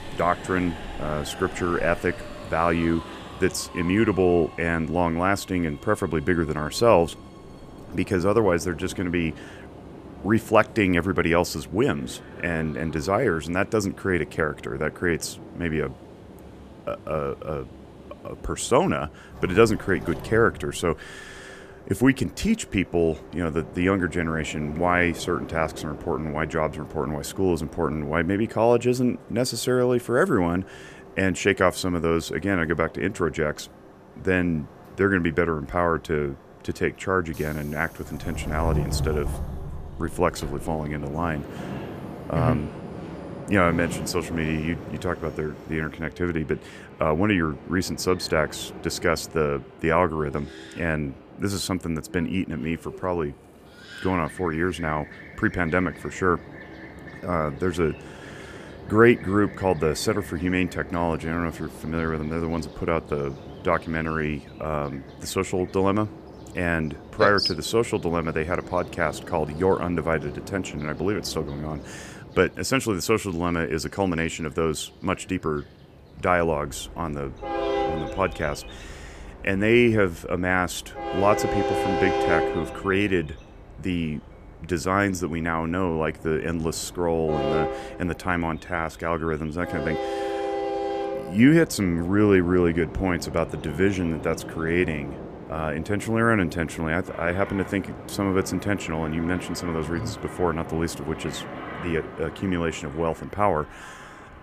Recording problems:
train or aircraft noise; noticeable; throughout; 10 dB below the speech

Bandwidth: 14.5 kHz